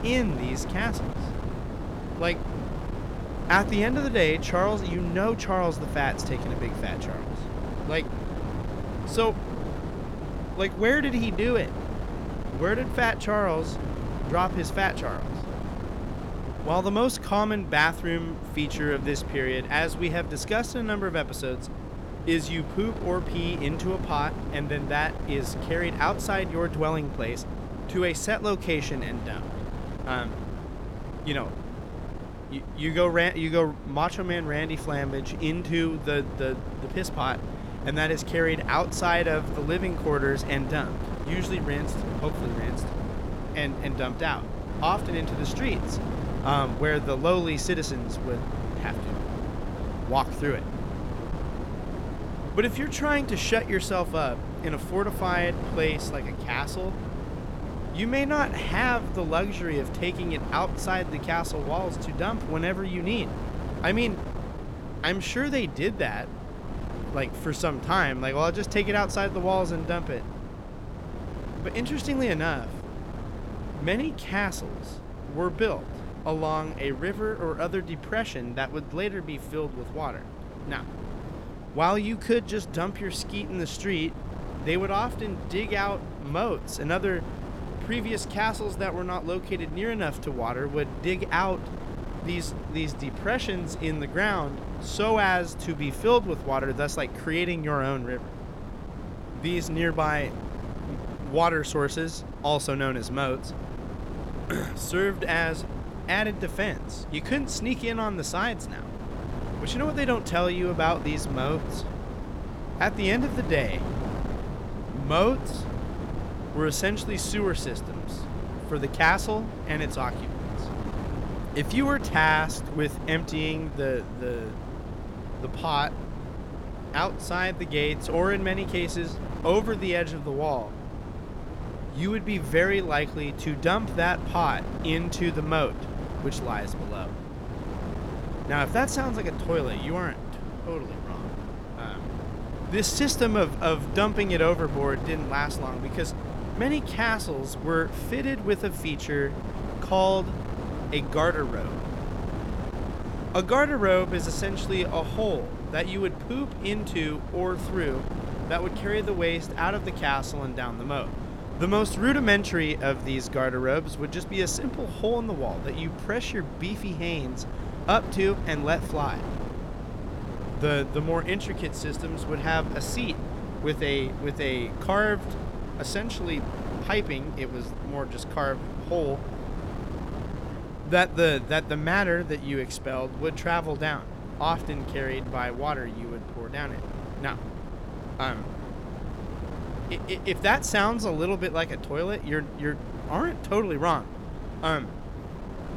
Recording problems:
wind noise on the microphone; occasional gusts; 10 dB below the speech

